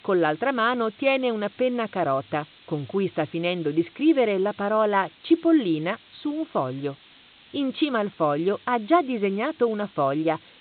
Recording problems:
high frequencies cut off; severe; nothing above 4 kHz
hiss; faint; throughout; 25 dB below the speech

